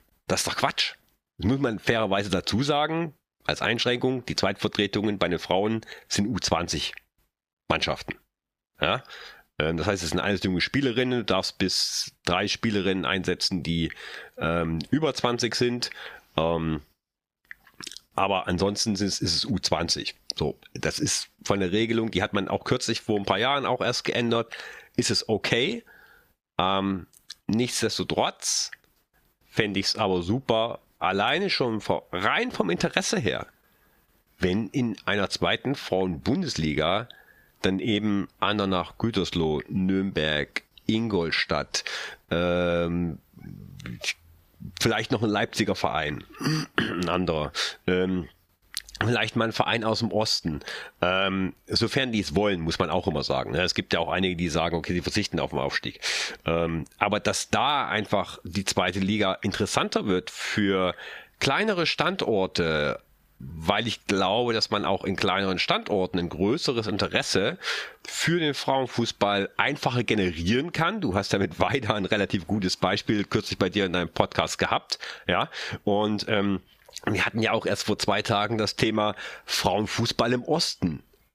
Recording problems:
squashed, flat; somewhat

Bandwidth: 15 kHz